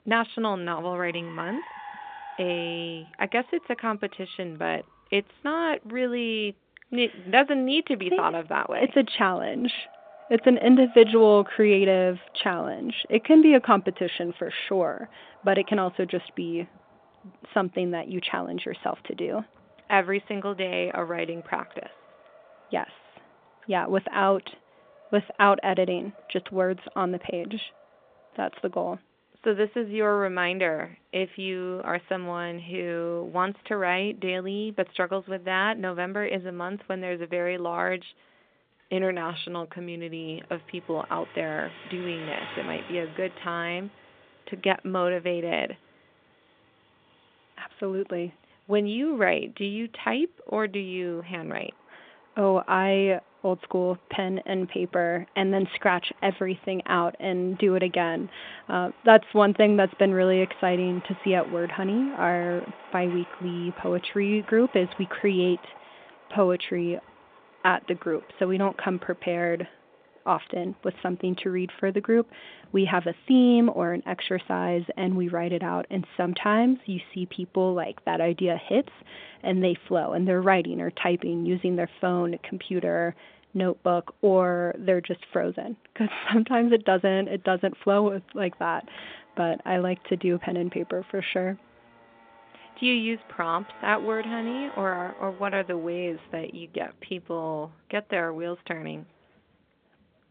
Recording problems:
phone-call audio
traffic noise; faint; throughout; 25 dB below the speech

